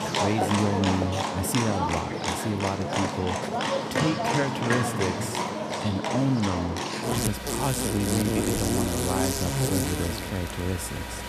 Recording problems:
animal sounds; very loud; throughout; 1 dB above the speech

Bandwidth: 14 kHz